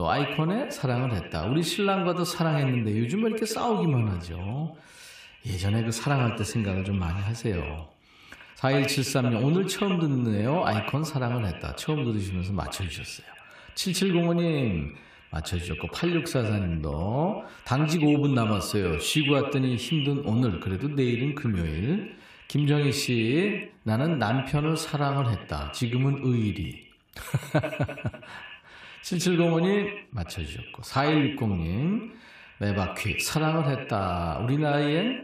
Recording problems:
echo of what is said; strong; throughout; 80 ms later, 8 dB below the speech
abrupt cut into speech; at the start

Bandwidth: 15 kHz